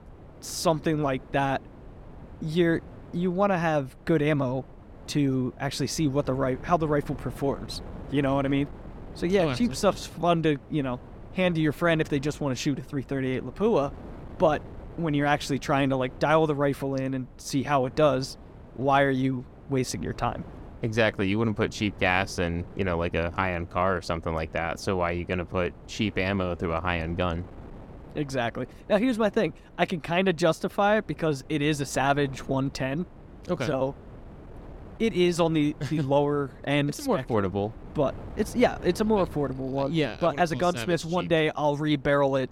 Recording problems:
wind noise on the microphone; occasional gusts; 25 dB below the speech

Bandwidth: 17 kHz